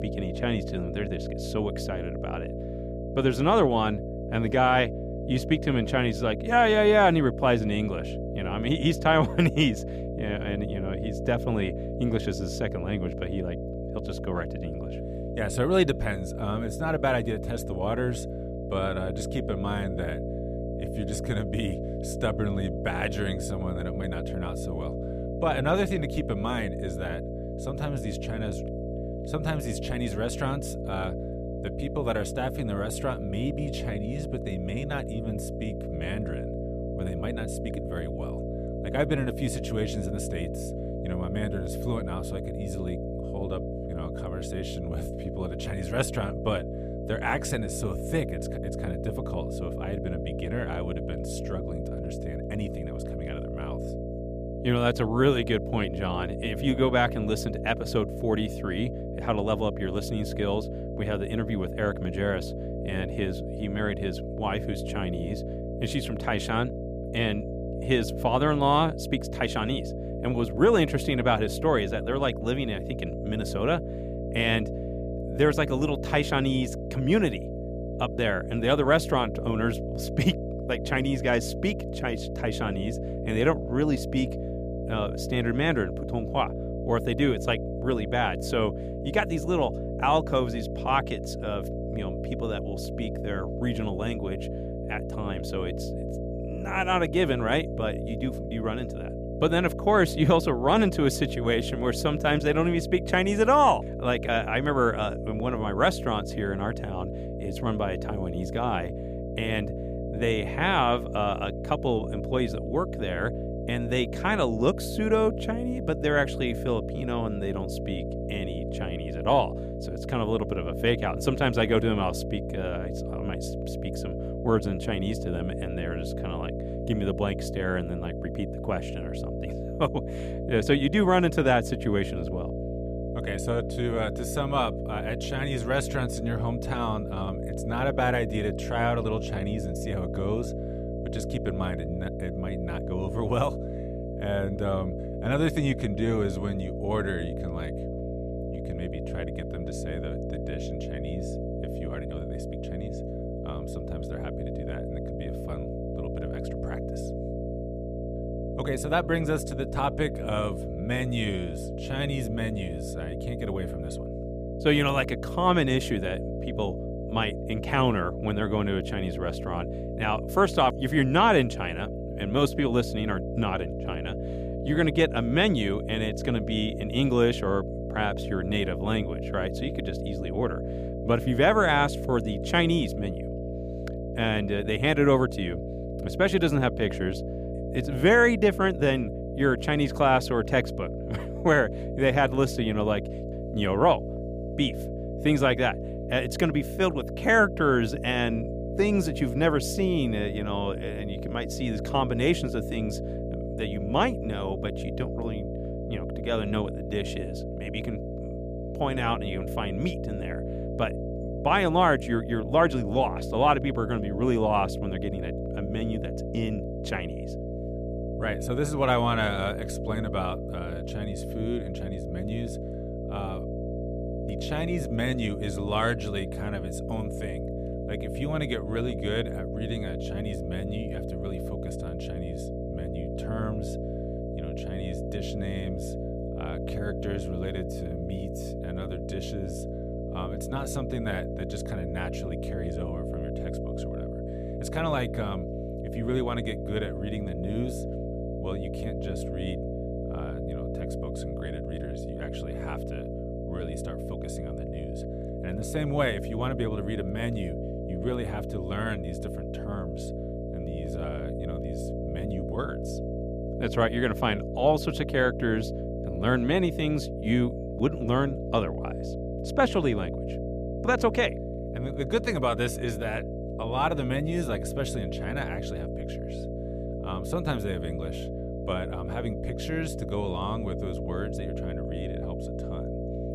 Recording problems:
electrical hum; loud; throughout; 60 Hz, 9 dB below the speech

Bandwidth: 15 kHz